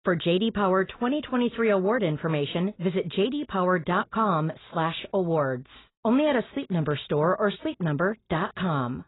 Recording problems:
garbled, watery; badly; nothing above 4 kHz

